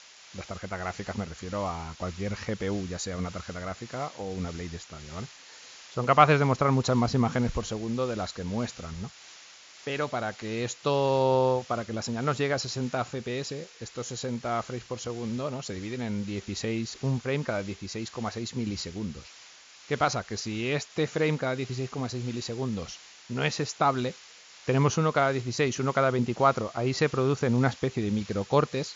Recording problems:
high frequencies cut off; noticeable; nothing above 7.5 kHz
hiss; noticeable; throughout; 20 dB below the speech

